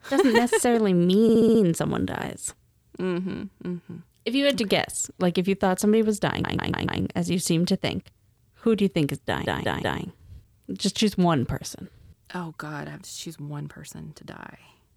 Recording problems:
audio stuttering; at 1 s, at 6.5 s and at 9.5 s

